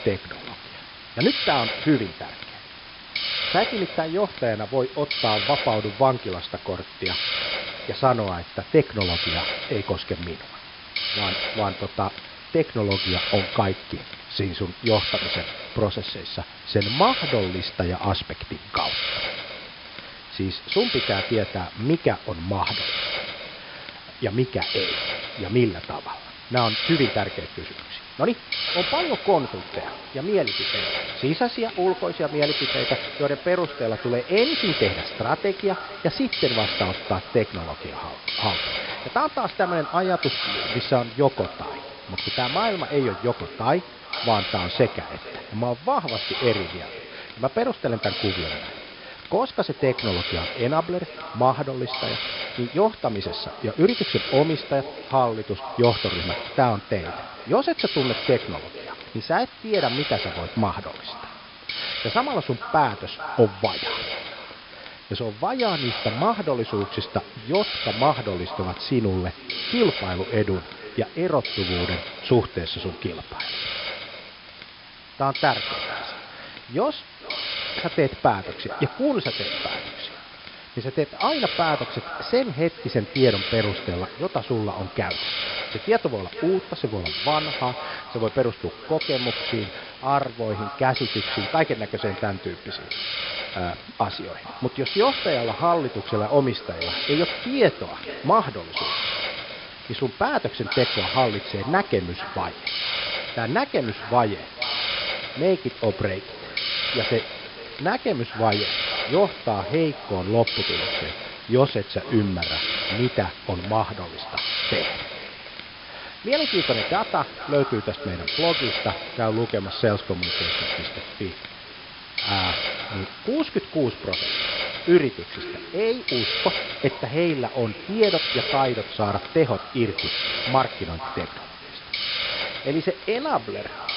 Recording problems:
echo of what is said; noticeable; from 29 s on; 450 ms later, 15 dB below the speech
high frequencies cut off; noticeable; nothing above 5.5 kHz
hiss; loud; throughout; 3 dB below the speech

